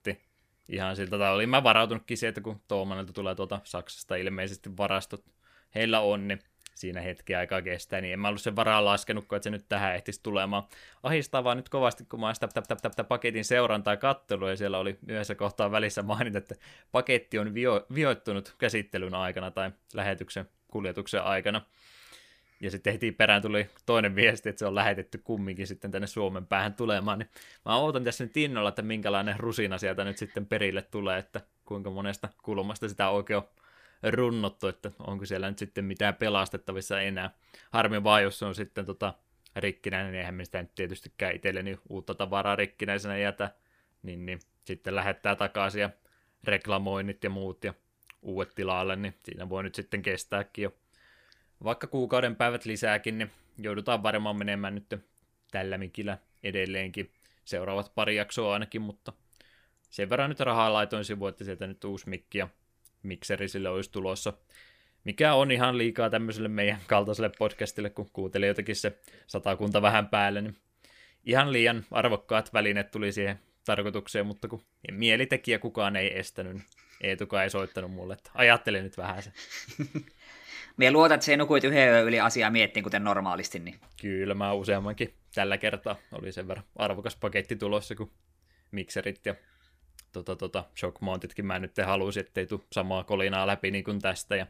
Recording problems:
audio stuttering; at 12 s

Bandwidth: 15 kHz